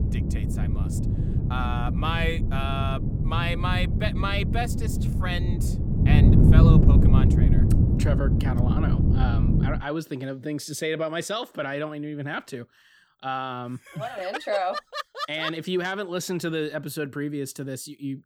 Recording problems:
wind noise on the microphone; heavy; until 10 s; 3 dB below the speech

